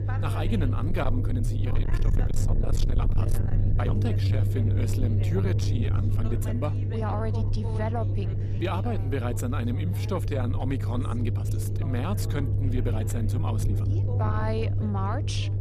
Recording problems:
distortion; slight; 10 dB below the speech
low rumble; loud; throughout; 5 dB below the speech
voice in the background; noticeable; throughout; 10 dB below the speech
uneven, jittery; strongly; from 1 to 15 s

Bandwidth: 14 kHz